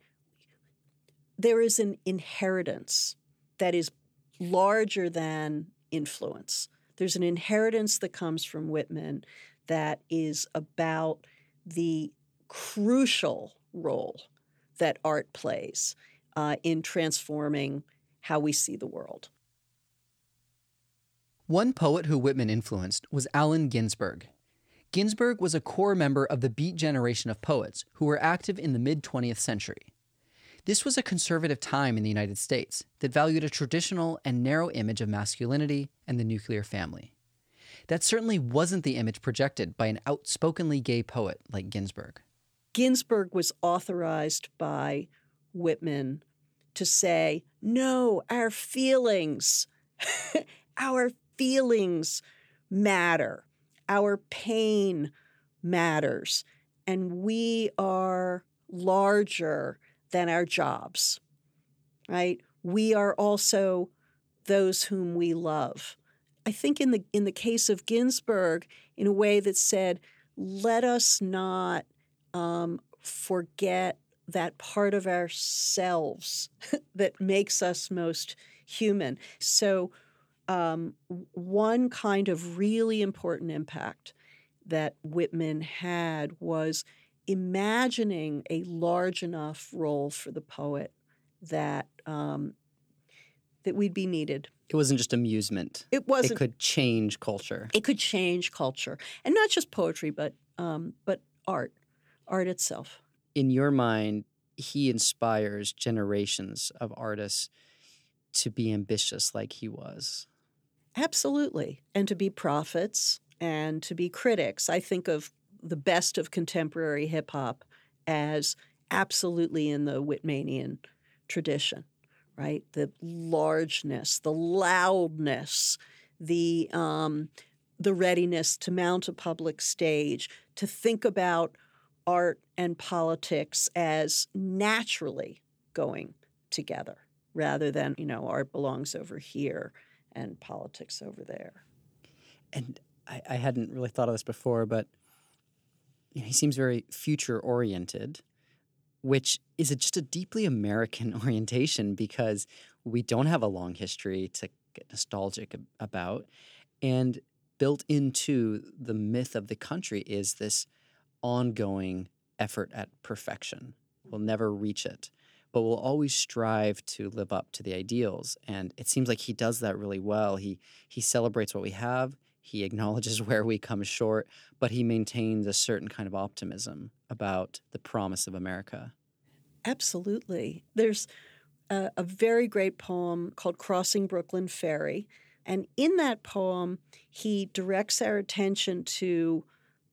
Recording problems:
none

